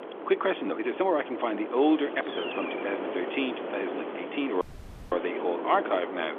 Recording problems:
phone-call audio; nothing above 3.5 kHz
wind noise on the microphone; heavy; 7 dB below the speech
hiss; noticeable; from 2 to 5.5 s; 15 dB below the speech
uneven, jittery; strongly; from 0.5 to 4.5 s
audio cutting out; at 4.5 s for 0.5 s

